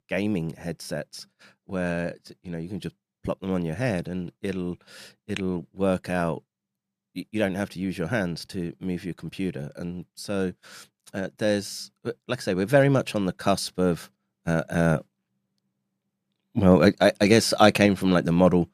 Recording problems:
none

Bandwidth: 14.5 kHz